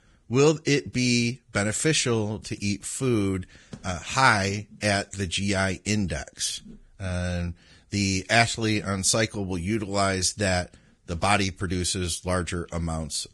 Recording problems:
garbled, watery; badly; nothing above 10.5 kHz

